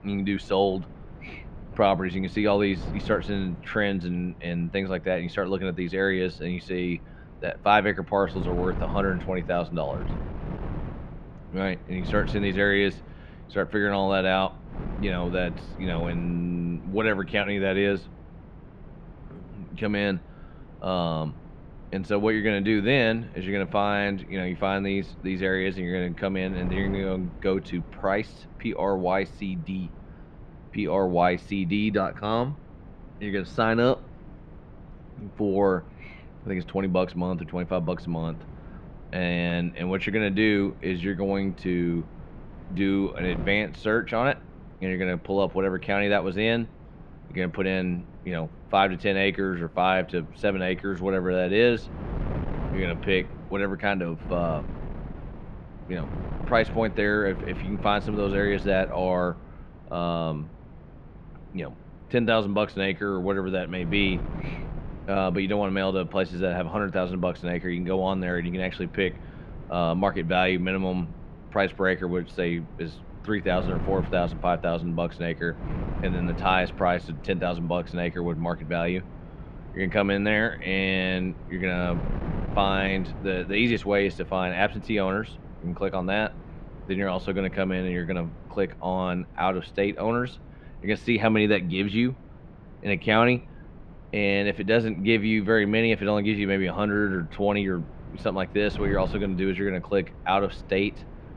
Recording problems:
muffled; slightly; fading above 3 kHz
wind noise on the microphone; occasional gusts; 20 dB below the speech

